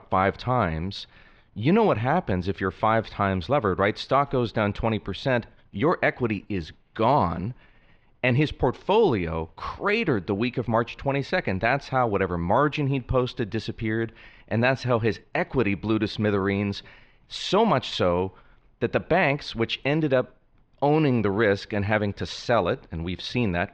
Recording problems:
muffled; slightly; fading above 3.5 kHz

